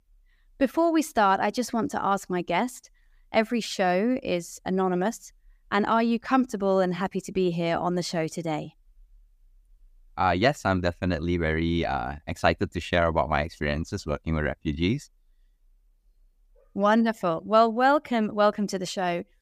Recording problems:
none

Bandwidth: 15 kHz